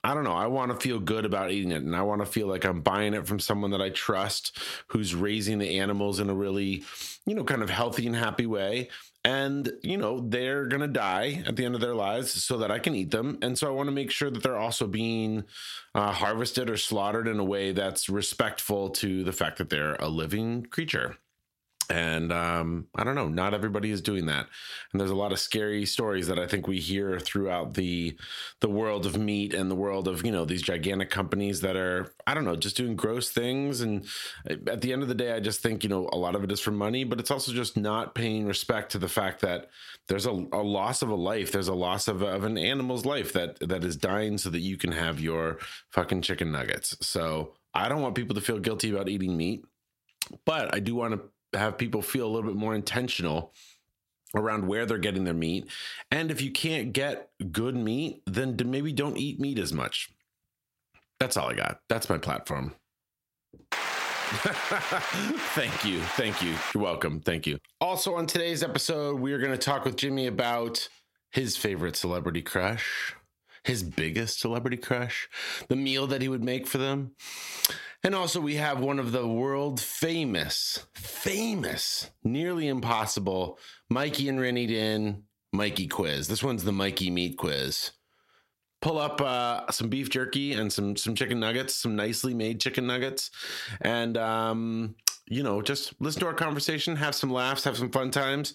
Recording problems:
squashed, flat; heavily

